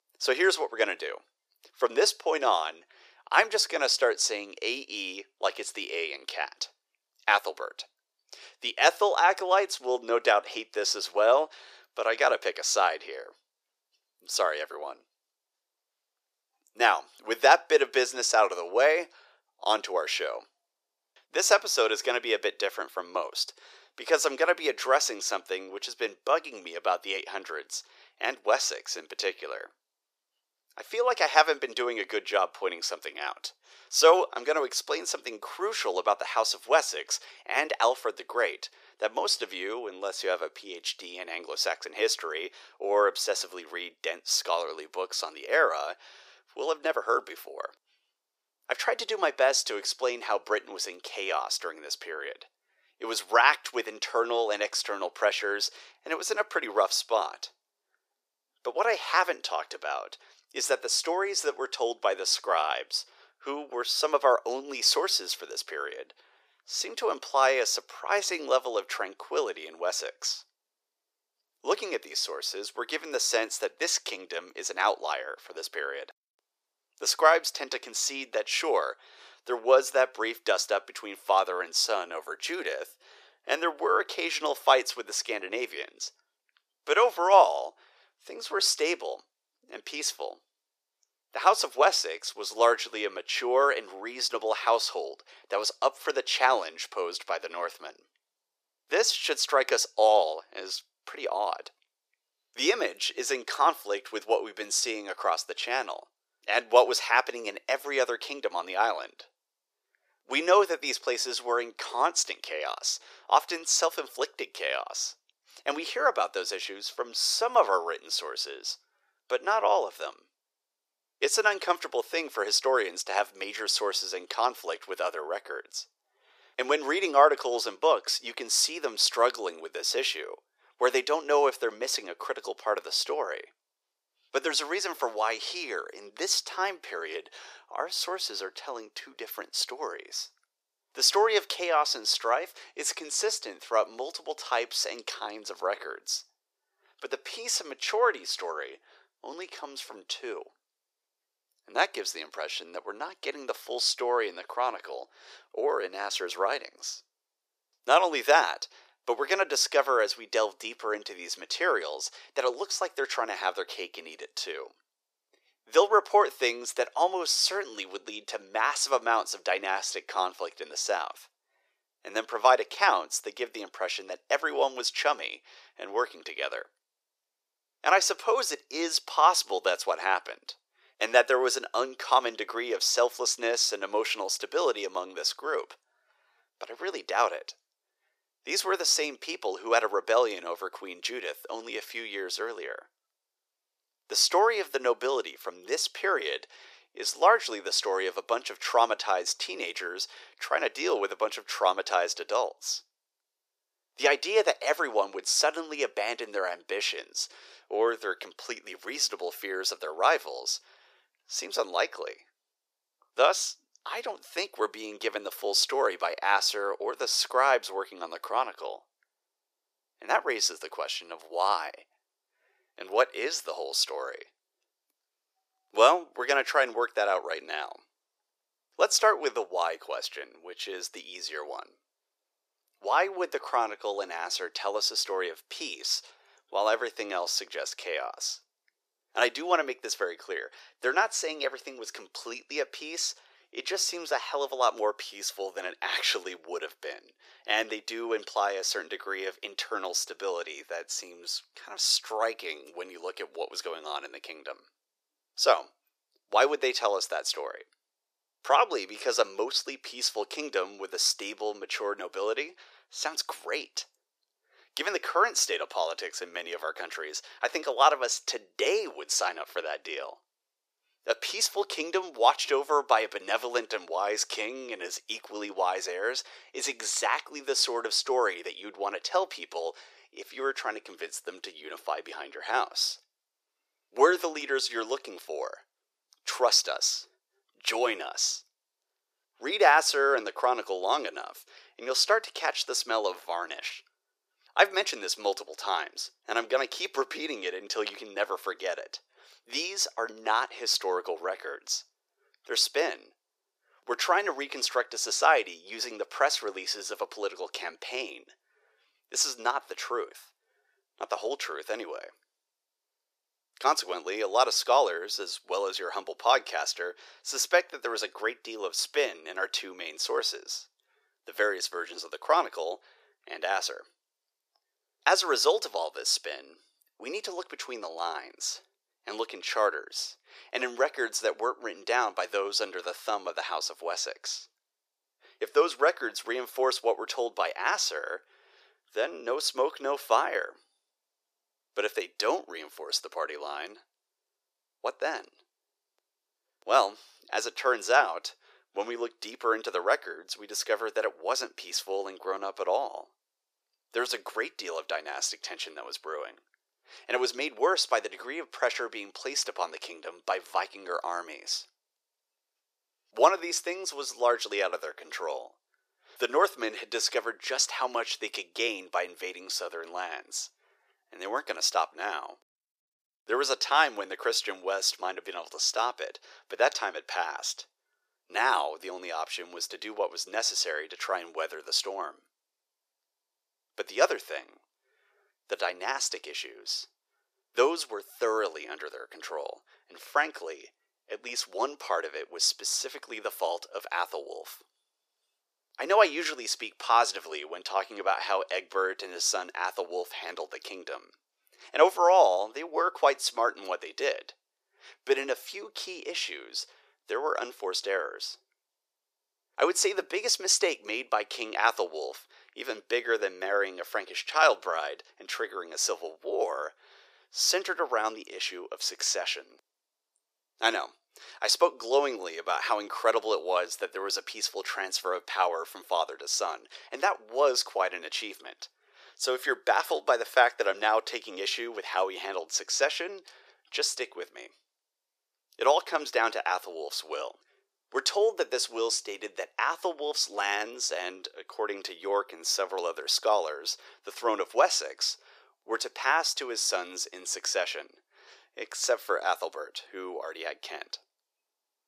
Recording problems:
thin; very; fading below 400 Hz

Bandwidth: 14.5 kHz